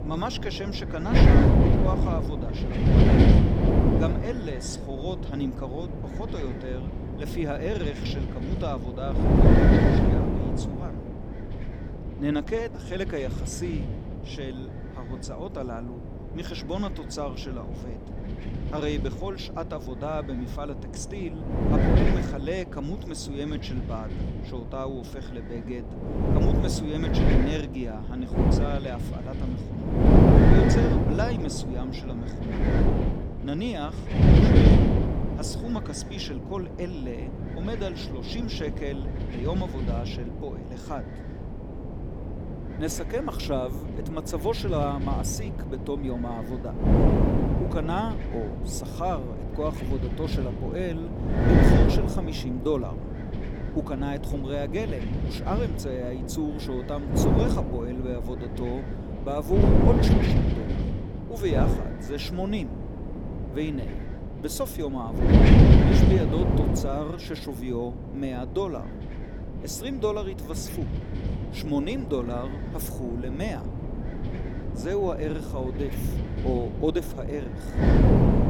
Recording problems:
wind noise on the microphone; heavy; 2 dB above the speech

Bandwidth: 18 kHz